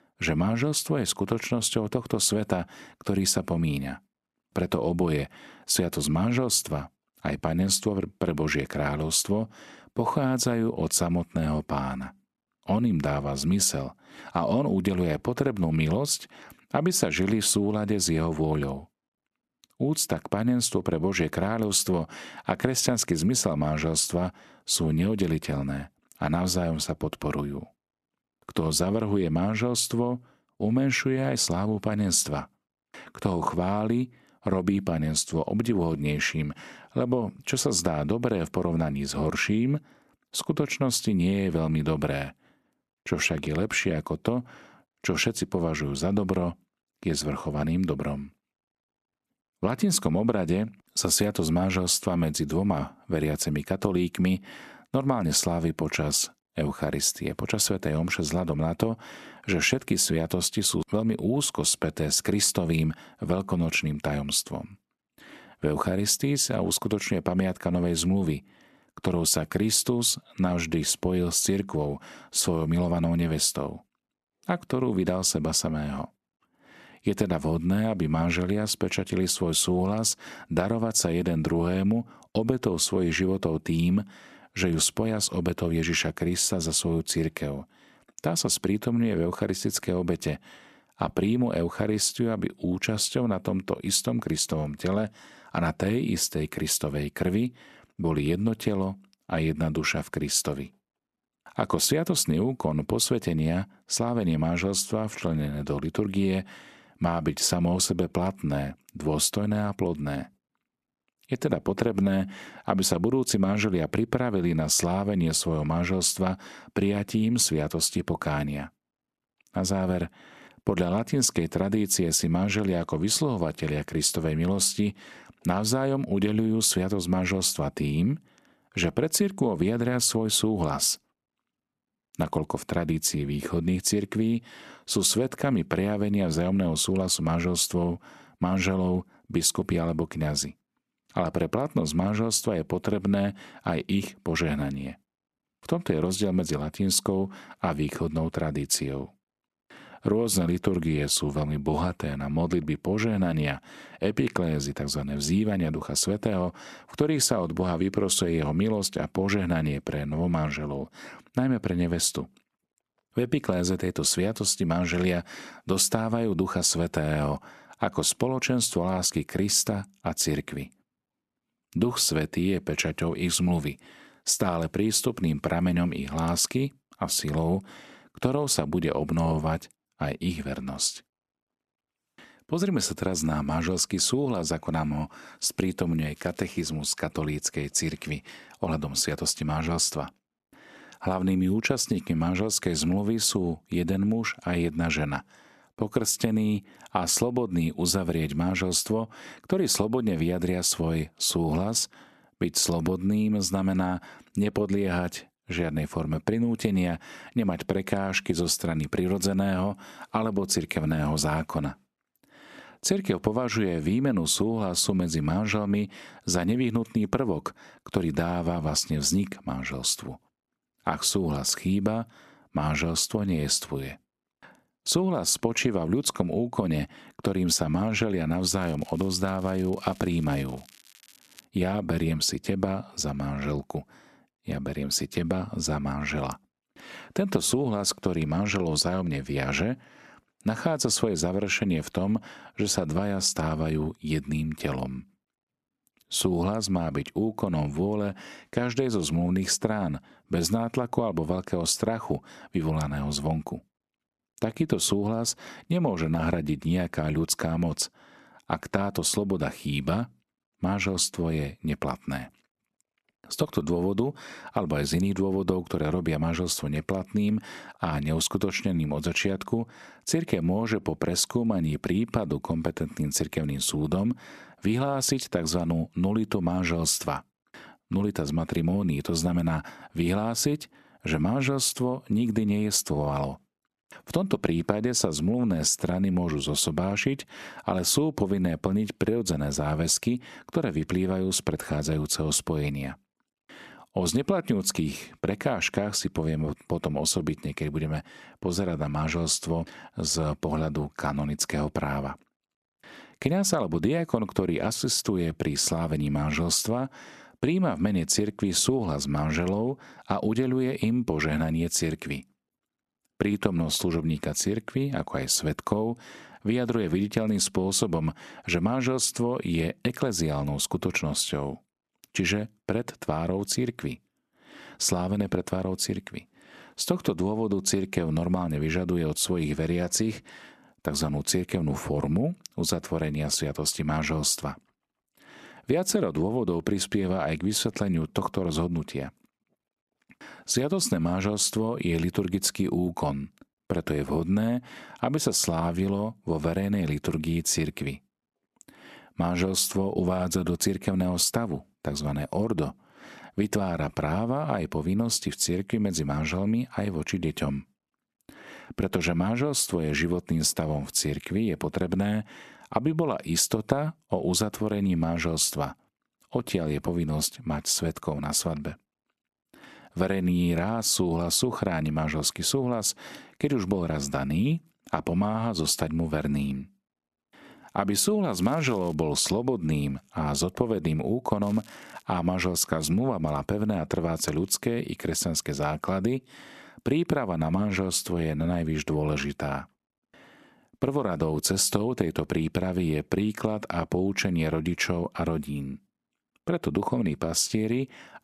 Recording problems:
crackling; faint; 4 times, first at 3:06; 25 dB below the speech

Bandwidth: 13.5 kHz